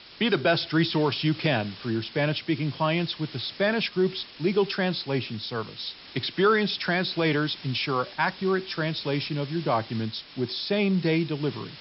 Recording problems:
high frequencies cut off; noticeable; nothing above 5.5 kHz
hiss; noticeable; throughout; 15 dB below the speech

